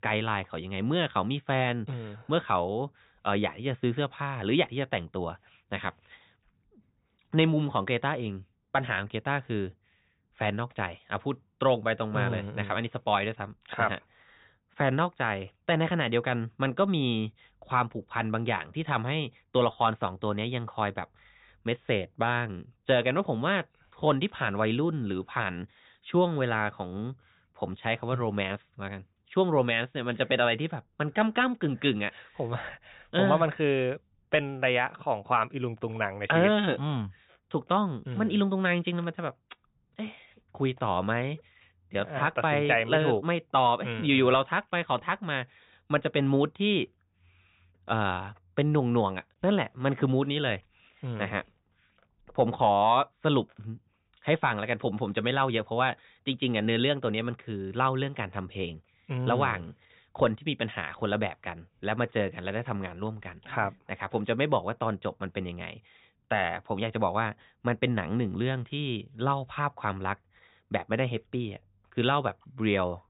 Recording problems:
high frequencies cut off; severe; nothing above 4 kHz

